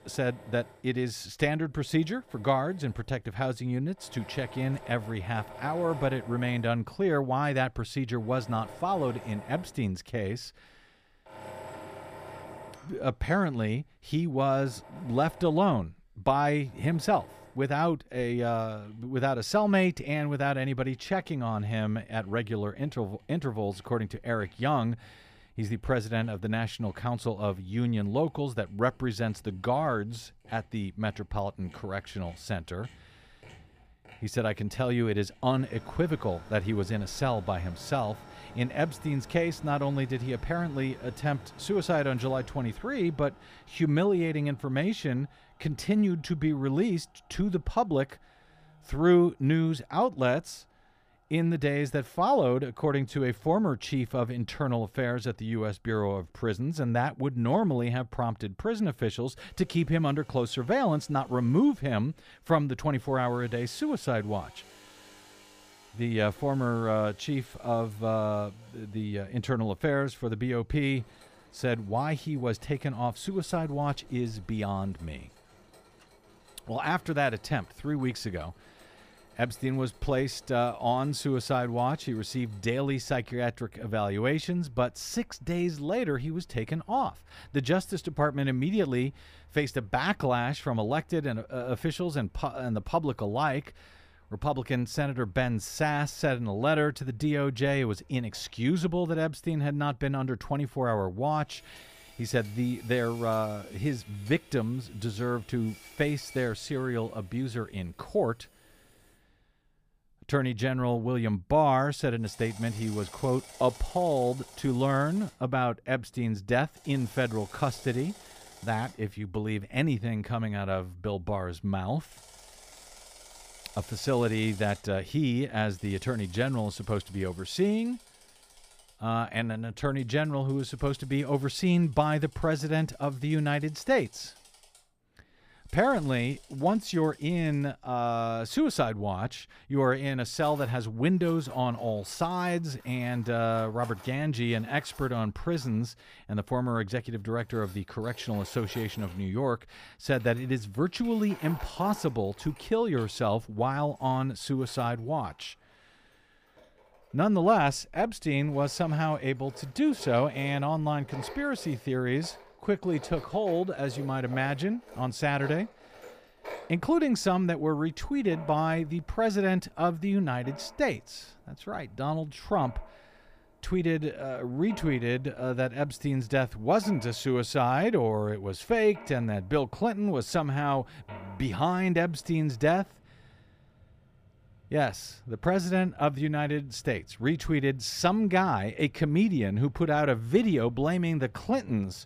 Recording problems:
machinery noise; faint; throughout; 20 dB below the speech

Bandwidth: 15 kHz